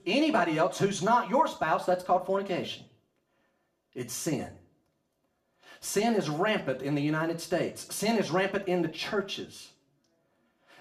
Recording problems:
off-mic speech; far
room echo; very slight; dies away in 0.4 s

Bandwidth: 14.5 kHz